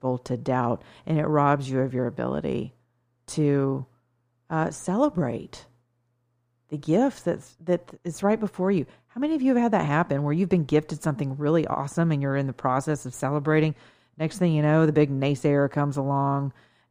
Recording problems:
muffled; slightly; fading above 2 kHz

